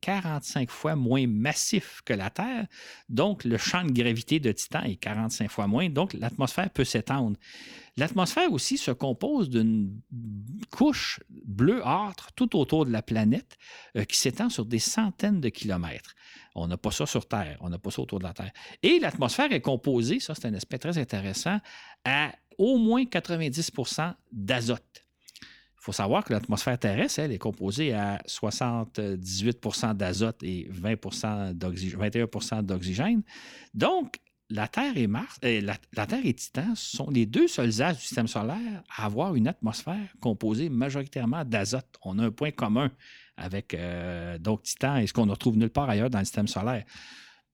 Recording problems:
none

